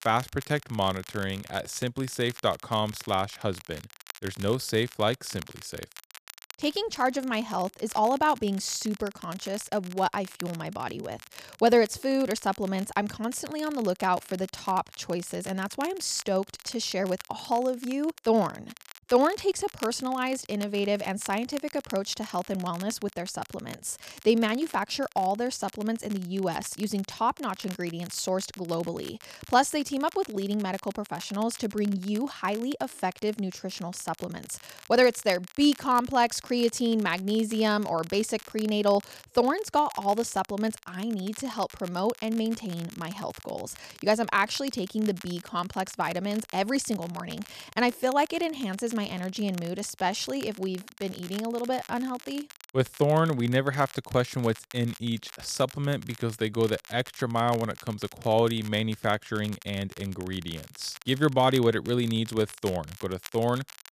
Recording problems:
crackle, like an old record; noticeable; 20 dB below the speech

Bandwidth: 14.5 kHz